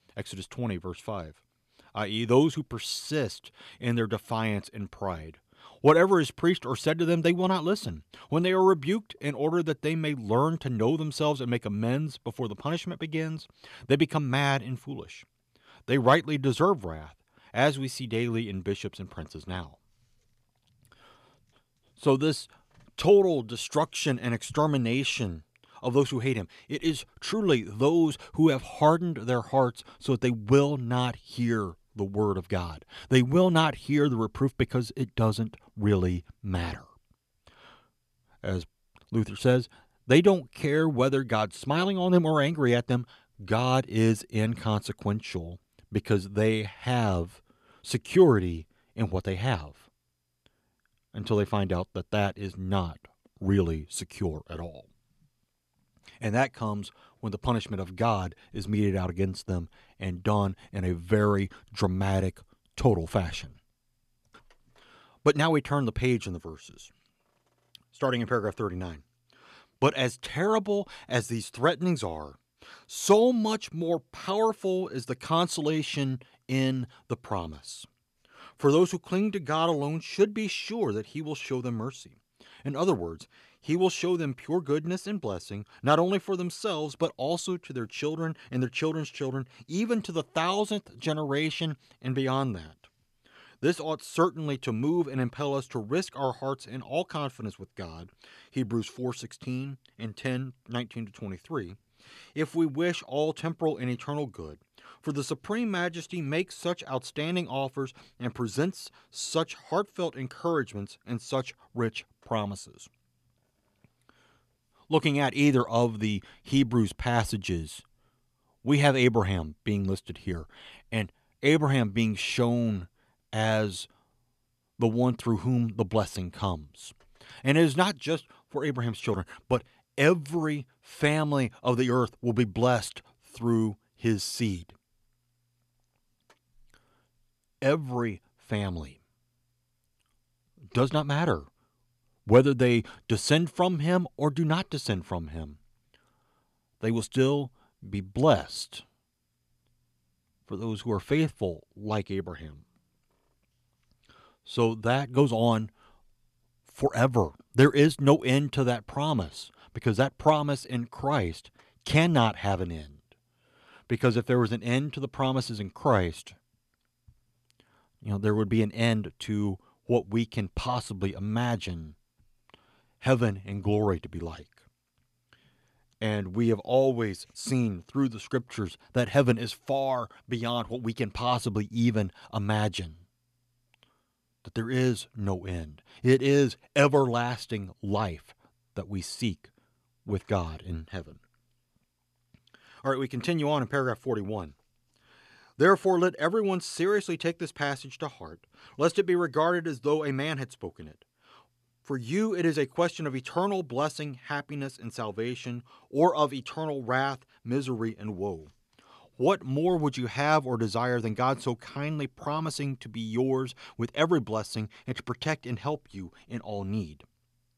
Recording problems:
none

